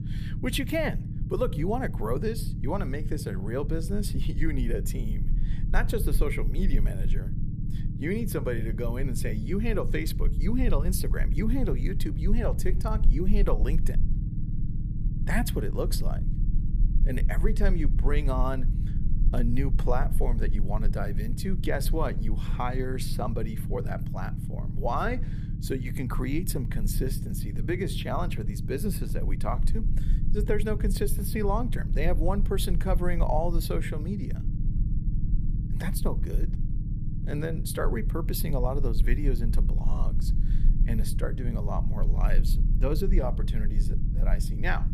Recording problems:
low rumble; noticeable; throughout; 10 dB below the speech

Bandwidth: 15 kHz